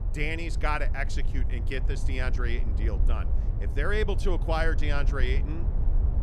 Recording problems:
low rumble; noticeable; throughout; 15 dB below the speech

